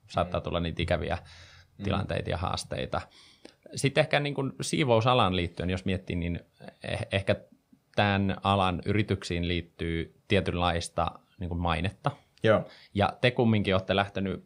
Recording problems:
none

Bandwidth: 15.5 kHz